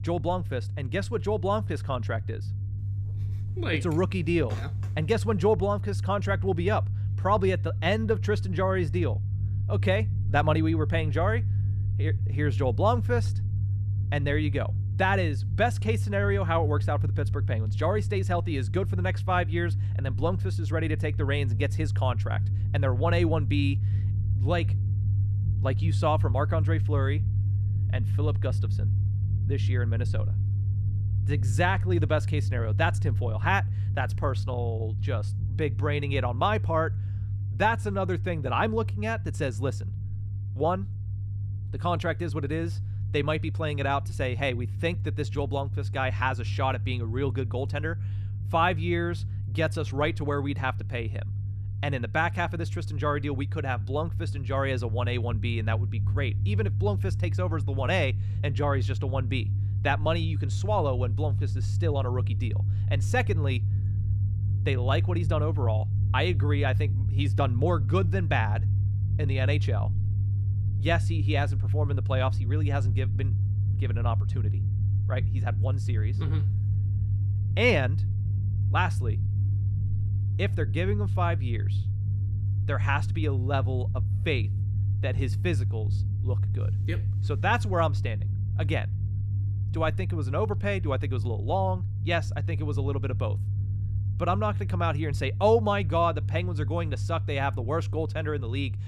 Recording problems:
low rumble; noticeable; throughout; 15 dB below the speech

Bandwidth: 15 kHz